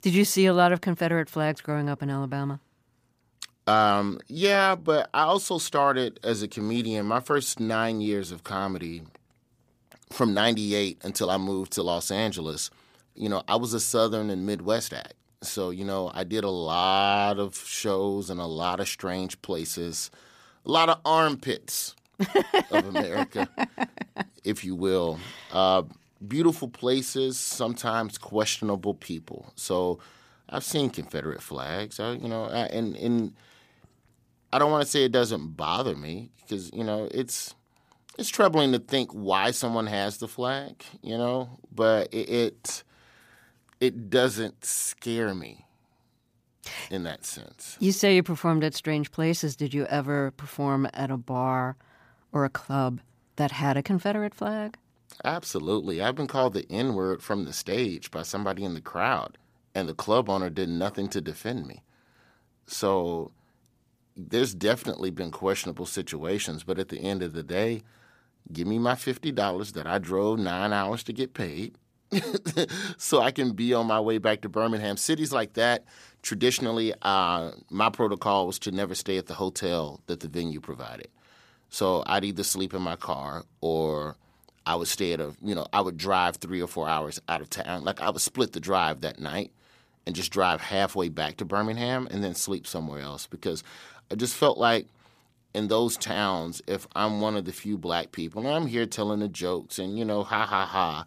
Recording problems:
none

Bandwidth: 15 kHz